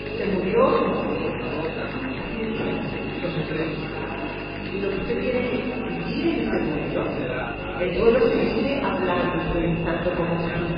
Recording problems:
off-mic speech; far
garbled, watery; badly; nothing above 5 kHz
room echo; noticeable; dies away in 1.7 s
electrical hum; loud; throughout; 50 Hz, 8 dB below the speech
chatter from many people; loud; throughout; 6 dB below the speech

